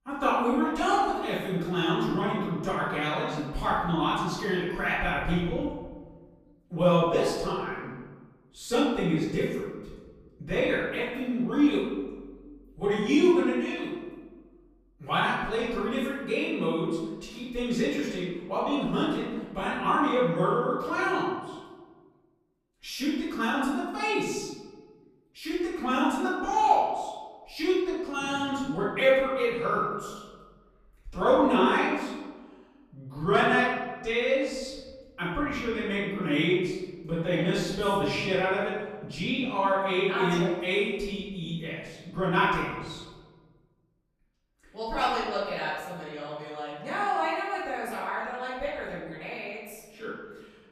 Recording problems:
off-mic speech; far
room echo; noticeable; dies away in 1.2 s

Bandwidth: 15 kHz